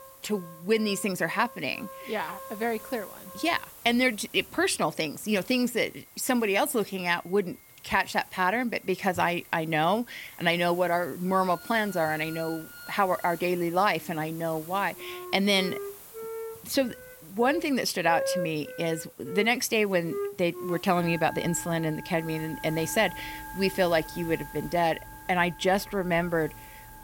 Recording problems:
background music; noticeable; throughout; 15 dB below the speech
hiss; noticeable; throughout; 20 dB below the speech

